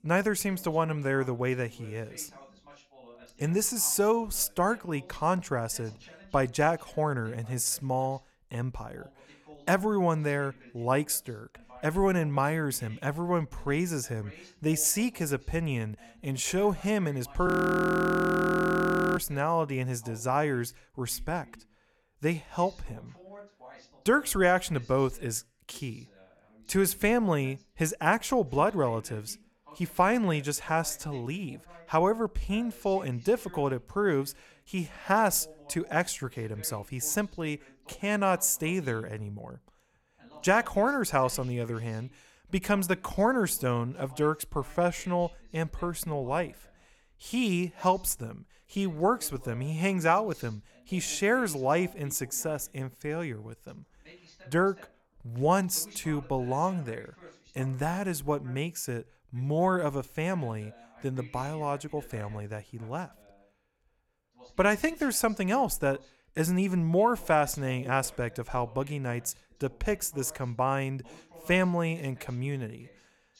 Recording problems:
voice in the background; faint; throughout; 25 dB below the speech
audio freezing; at 17 s for 1.5 s

